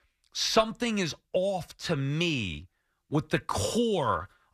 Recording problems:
none

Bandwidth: 14.5 kHz